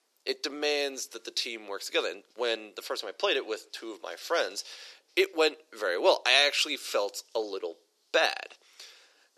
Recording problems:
thin; very; fading below 350 Hz

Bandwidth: 13.5 kHz